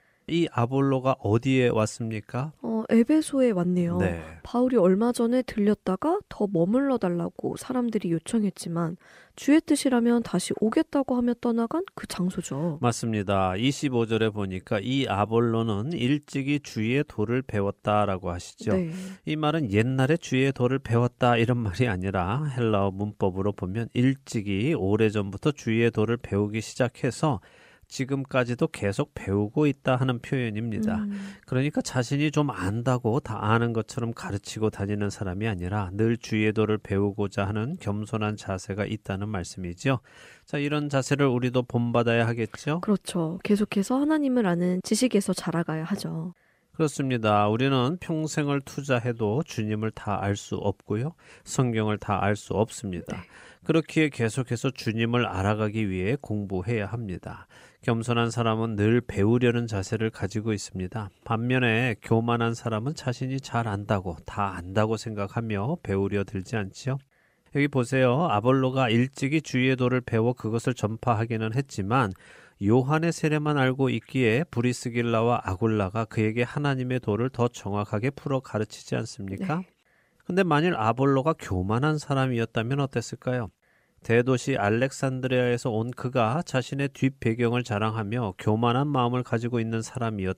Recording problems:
none

